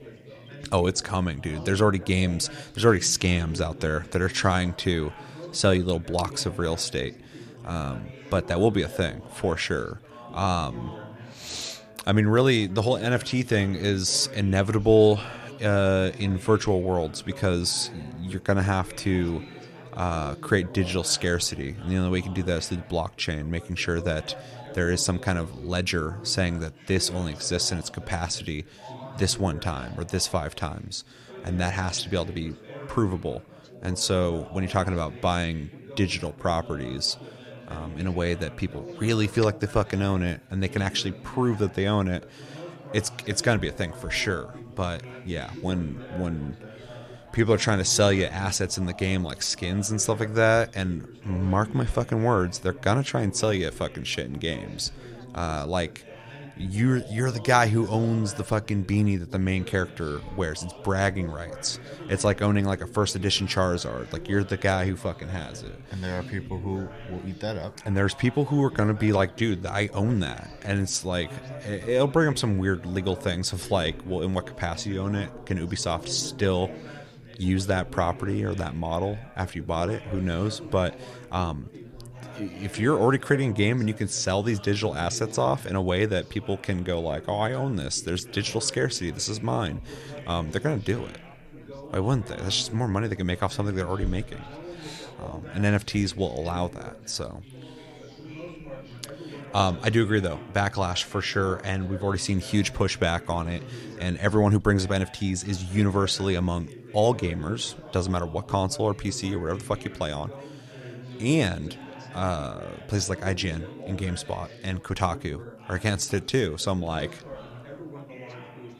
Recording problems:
background chatter; noticeable; throughout; 4 voices, 15 dB below the speech

